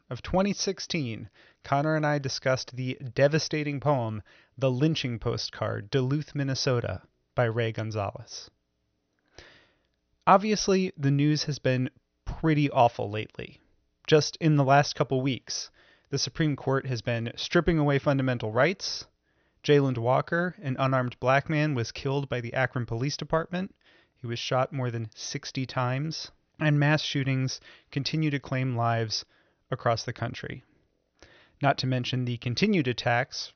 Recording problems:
high frequencies cut off; noticeable; nothing above 6 kHz

